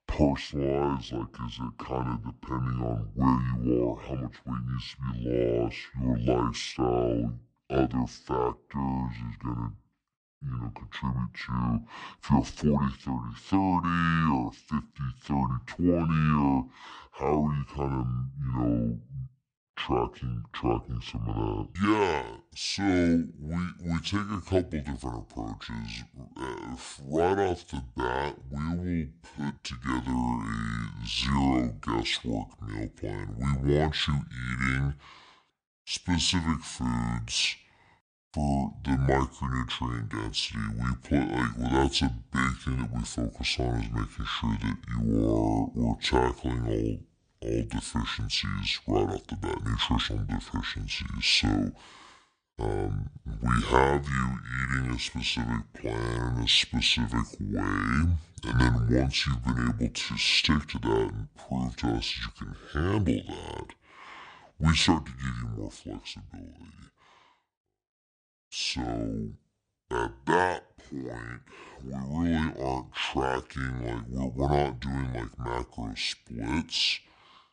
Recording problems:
wrong speed and pitch; too slow and too low; 0.6 times normal speed

